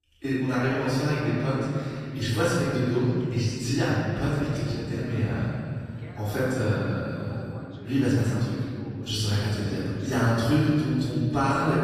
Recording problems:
room echo; strong; dies away in 2.2 s
off-mic speech; far
garbled, watery; slightly; nothing above 15 kHz
voice in the background; noticeable; throughout; 20 dB below the speech

